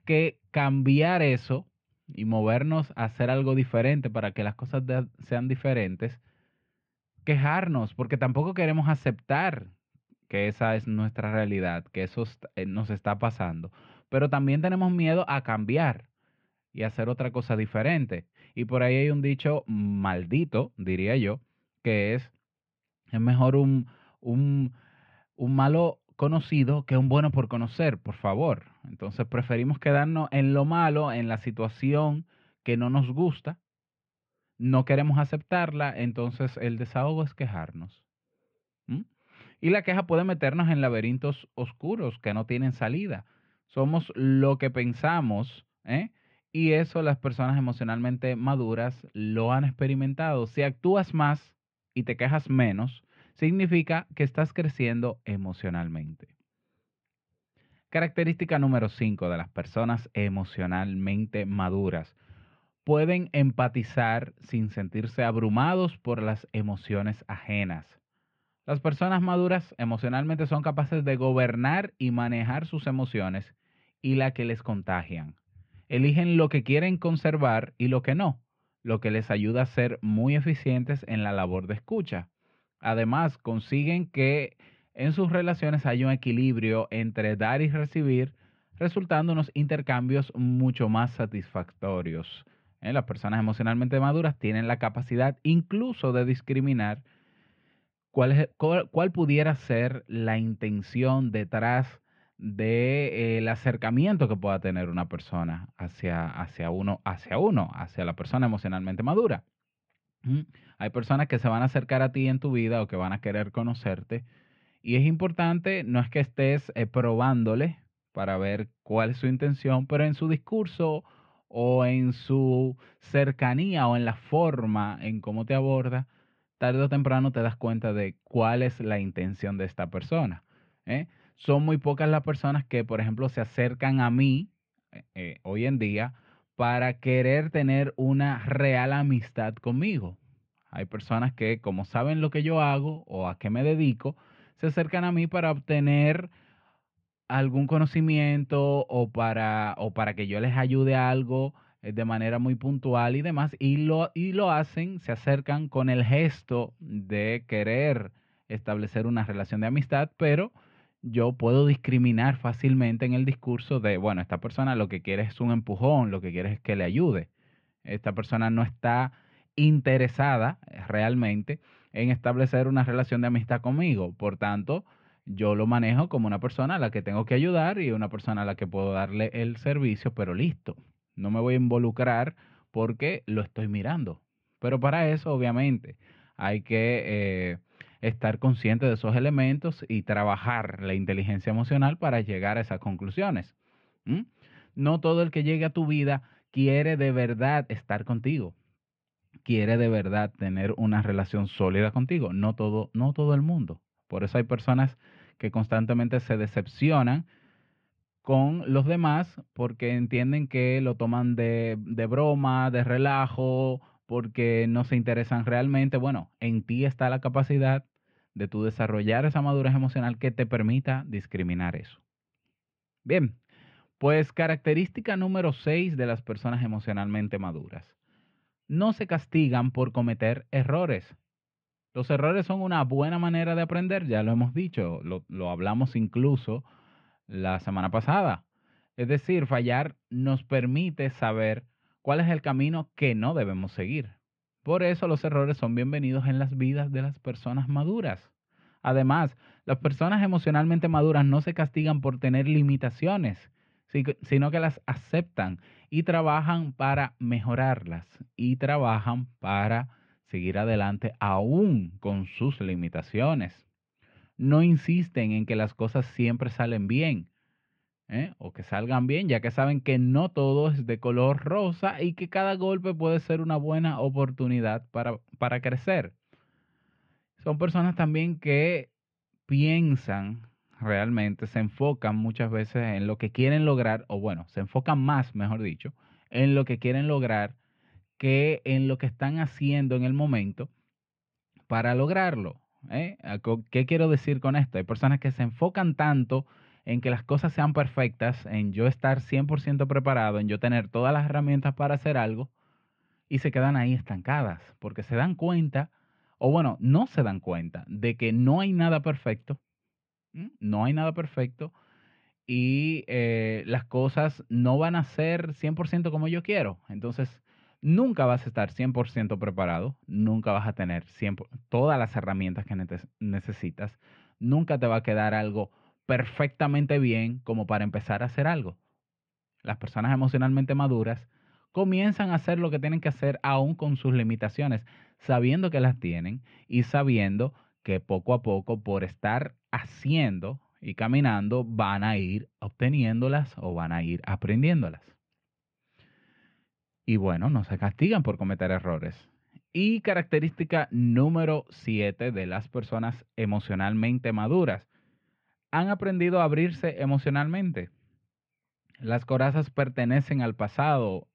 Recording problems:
muffled; very; fading above 2.5 kHz

